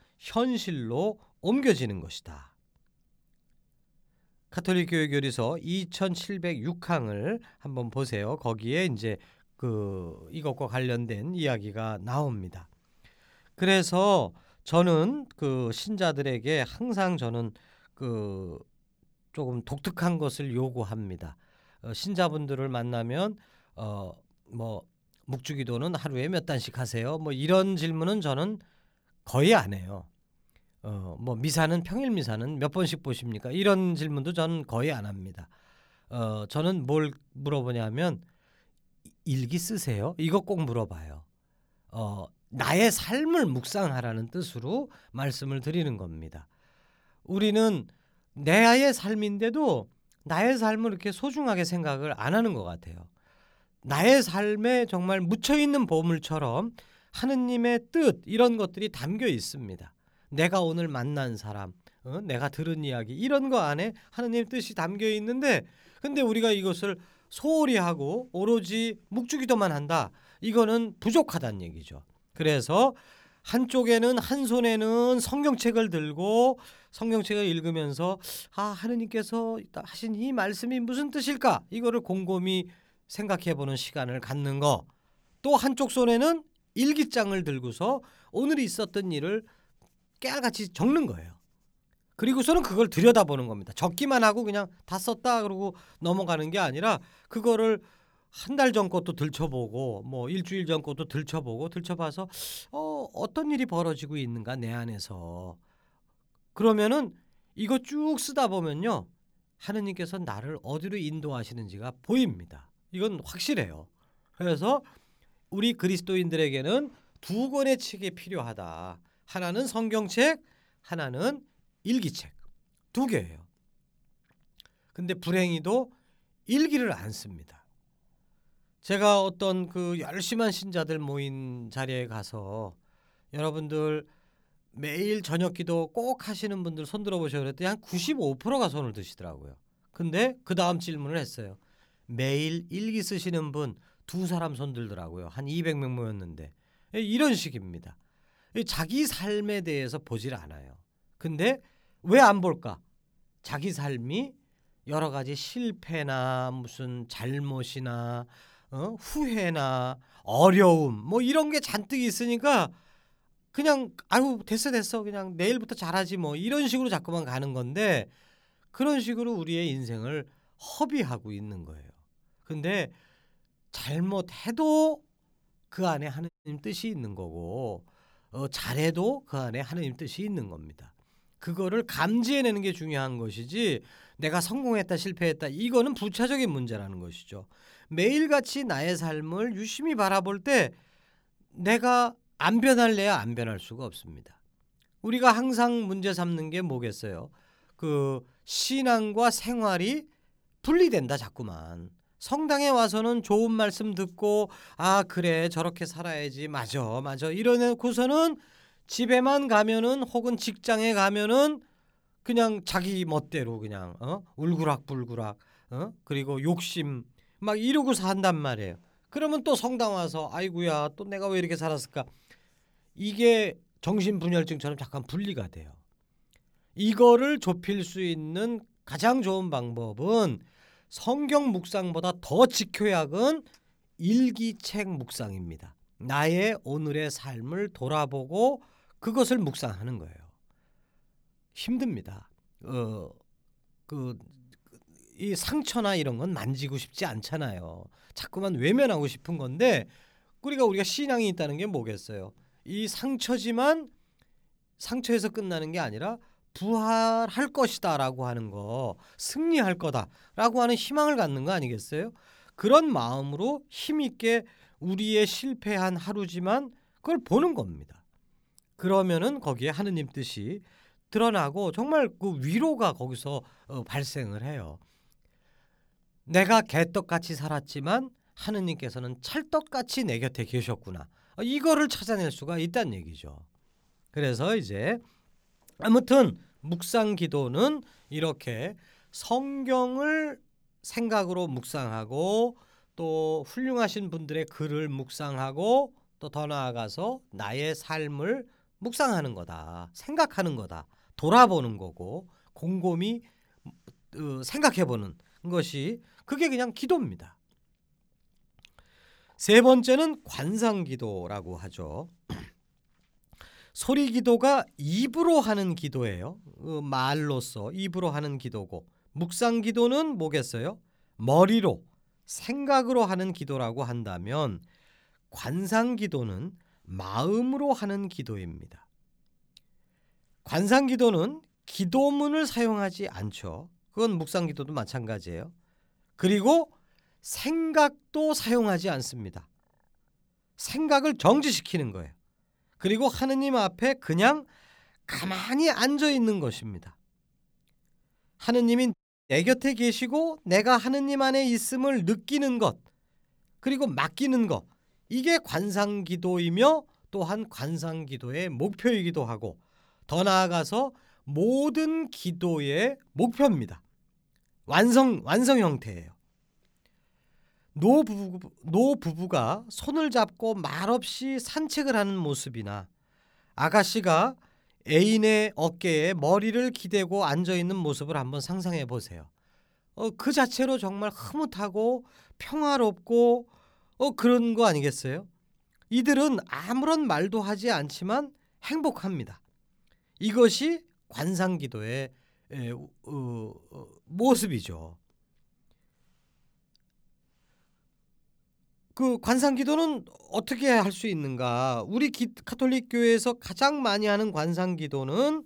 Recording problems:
audio cutting out; at 2:56 and at 5:49

